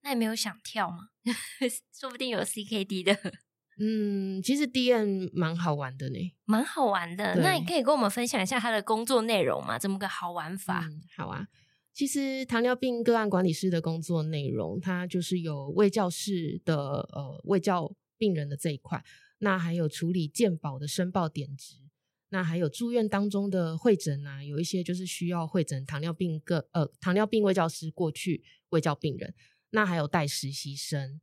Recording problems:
none

